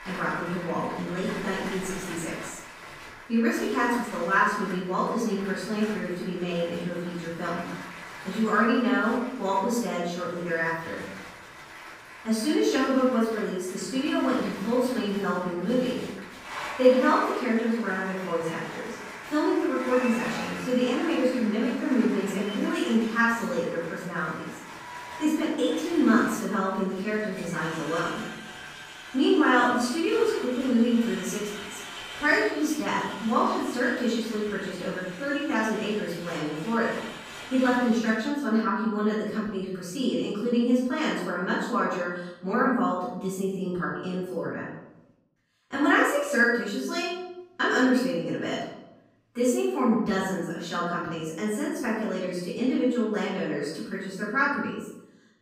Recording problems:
off-mic speech; far
room echo; noticeable; dies away in 0.7 s
crowd noise; noticeable; until 38 s; 15 dB below the speech

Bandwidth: 15.5 kHz